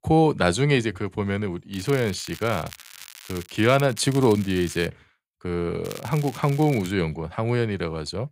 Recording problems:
crackling; noticeable; from 1.5 to 5 s and from 6 to 7 s; 20 dB below the speech

